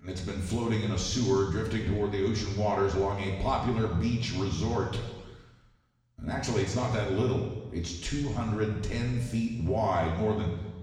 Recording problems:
off-mic speech; far
room echo; noticeable; dies away in 1.2 s

